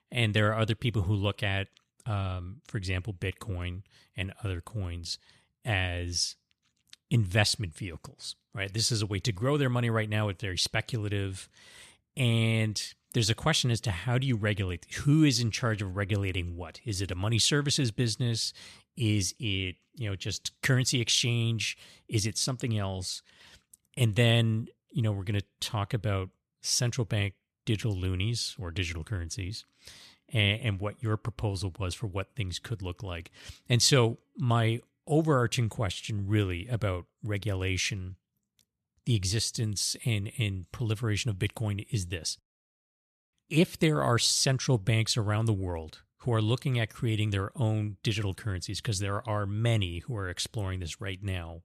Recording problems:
none

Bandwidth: 13.5 kHz